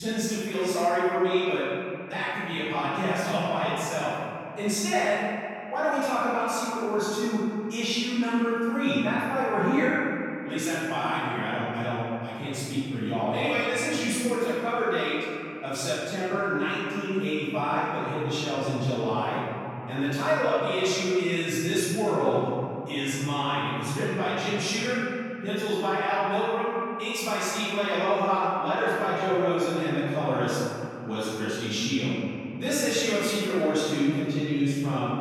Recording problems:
room echo; strong; dies away in 2.6 s
off-mic speech; far
abrupt cut into speech; at the start

